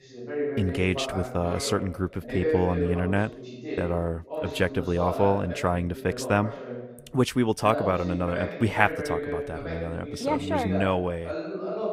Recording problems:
voice in the background; loud; throughout; 6 dB below the speech

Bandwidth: 15.5 kHz